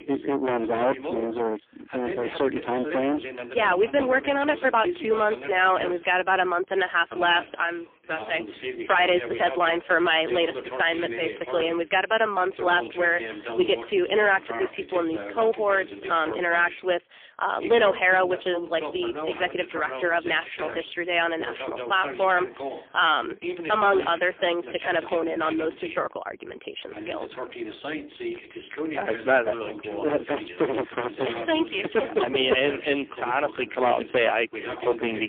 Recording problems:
phone-call audio; poor line; nothing above 3.5 kHz
distortion; slight; 5% of the sound clipped
voice in the background; noticeable; throughout; 10 dB below the speech
abrupt cut into speech; at the end

